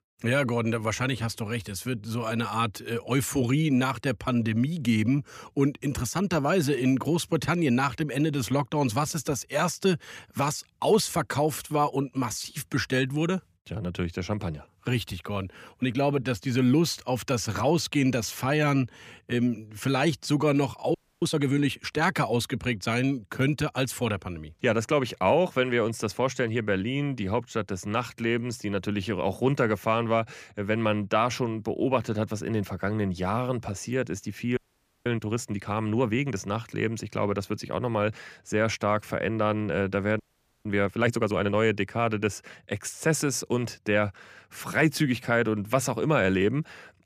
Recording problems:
audio freezing; at 21 s, at 35 s and at 40 s

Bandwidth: 15 kHz